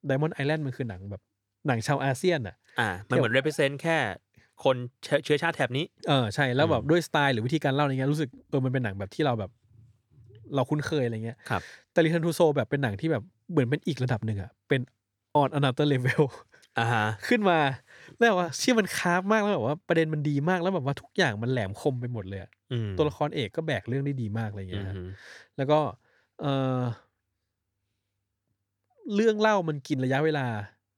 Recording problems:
none

